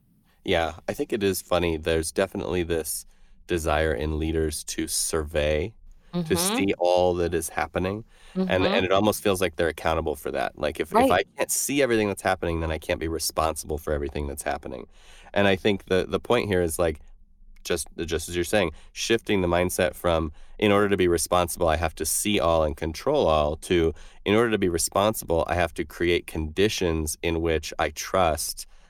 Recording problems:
none

